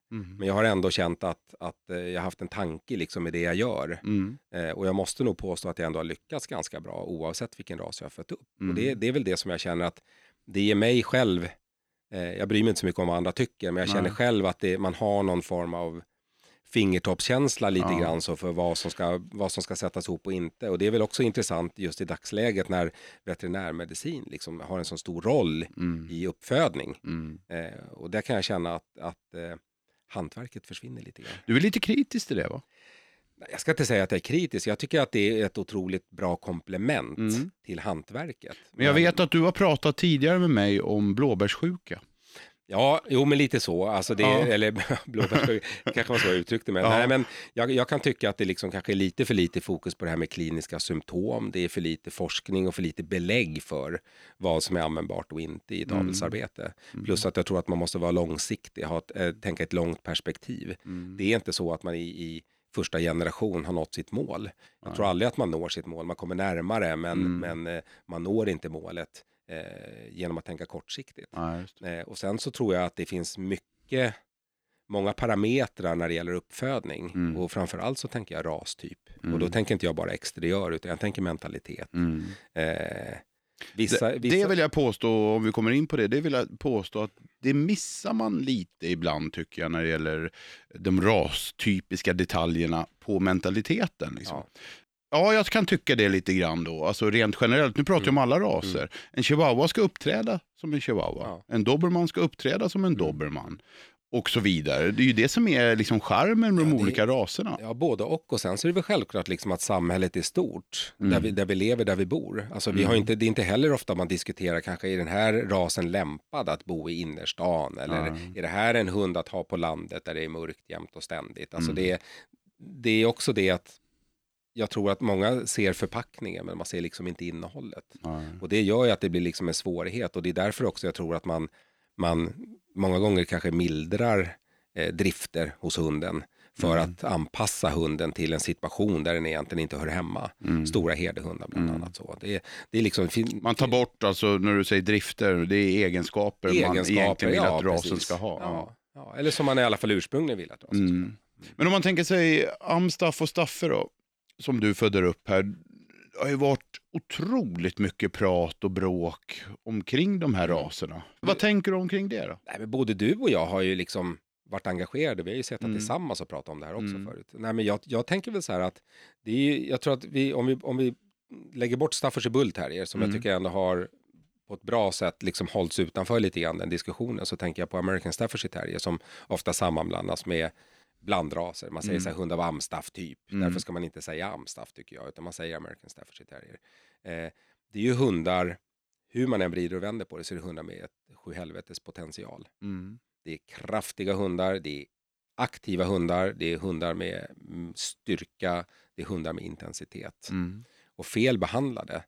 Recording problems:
none

